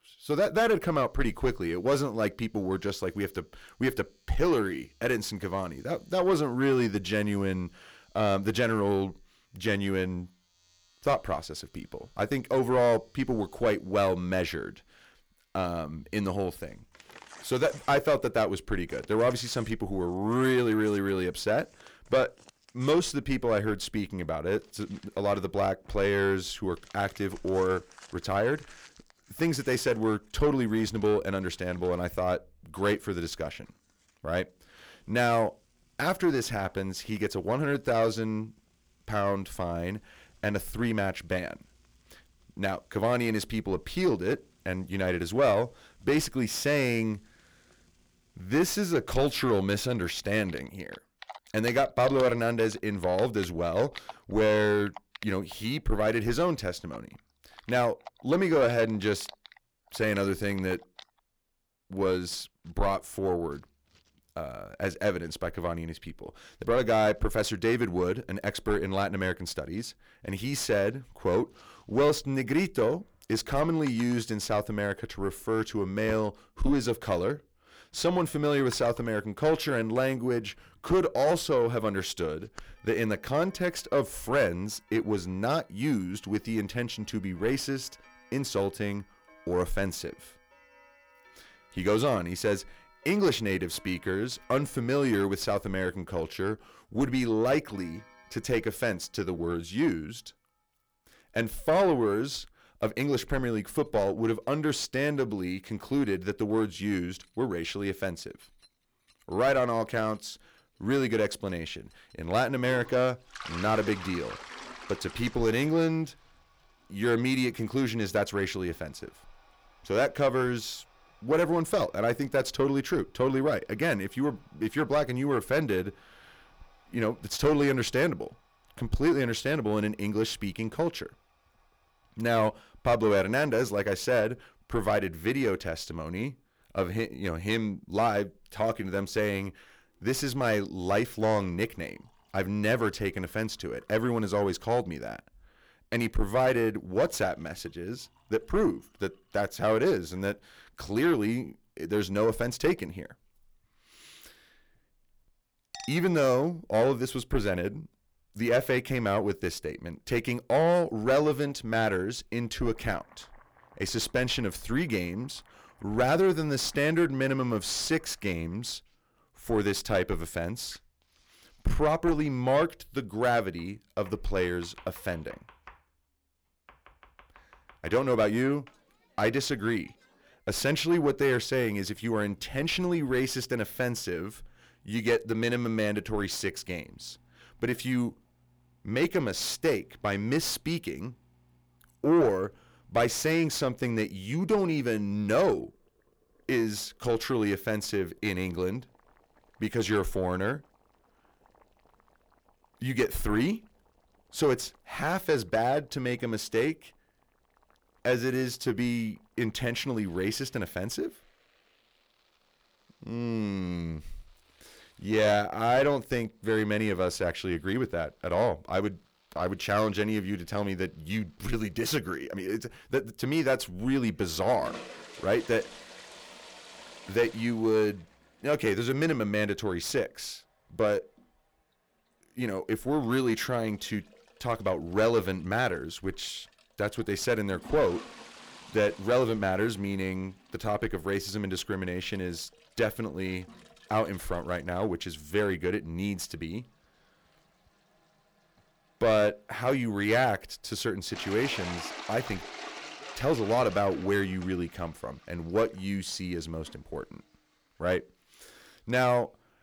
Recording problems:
distortion; slight; 10 dB below the speech
household noises; faint; throughout; 20 dB below the speech

